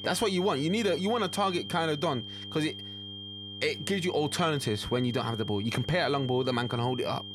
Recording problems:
high-pitched whine; loud; throughout; 3 kHz, 10 dB below the speech
electrical hum; faint; throughout; 50 Hz, 25 dB below the speech

